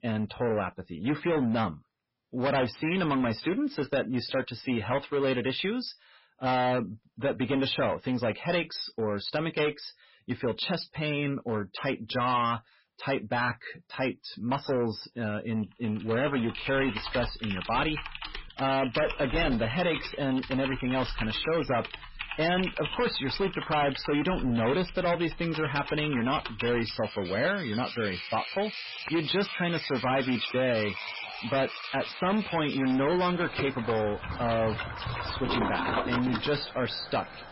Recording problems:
distortion; heavy; 14% of the sound clipped
garbled, watery; badly; nothing above 5.5 kHz
household noises; loud; from 16 s on; 7 dB below the speech

